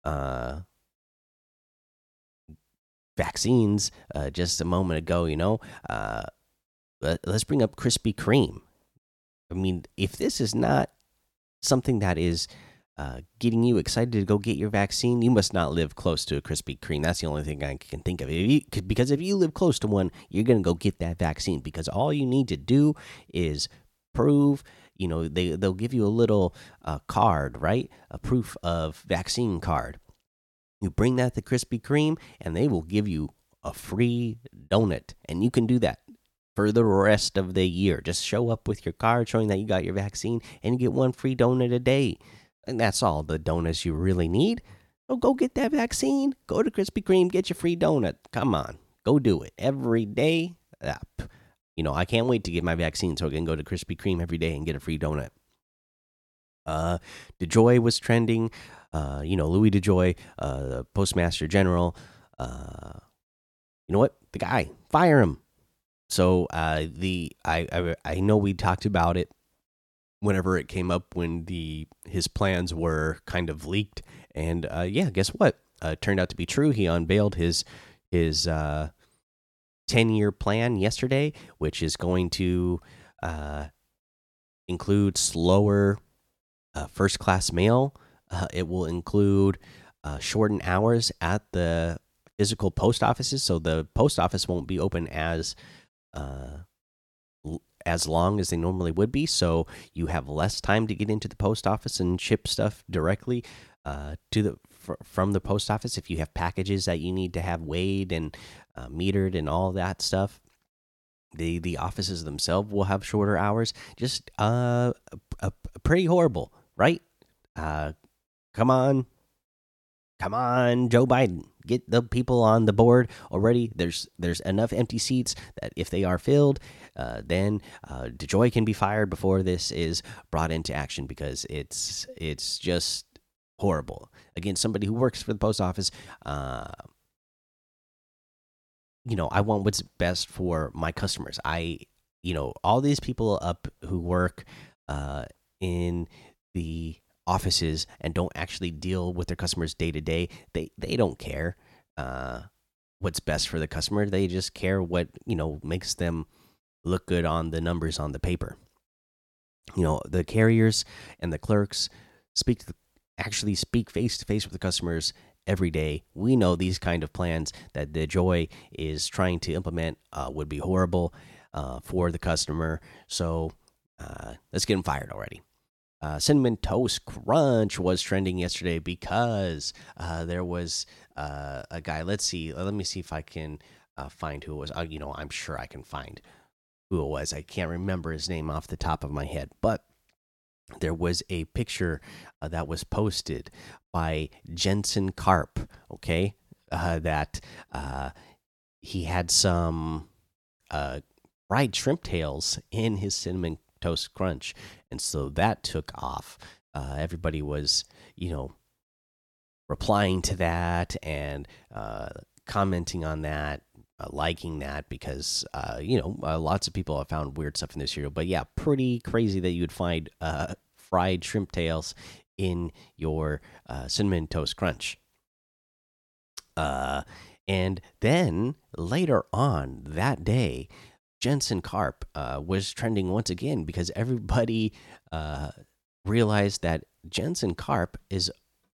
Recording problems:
none

